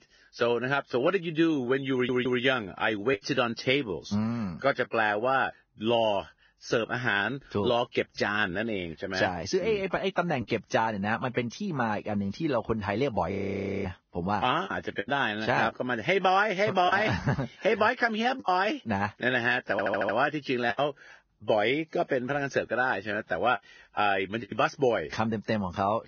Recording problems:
garbled, watery; badly; nothing above 6.5 kHz
choppy; occasionally; 2% of the speech affected
audio stuttering; at 2 s and at 20 s
audio freezing; at 13 s for 0.5 s

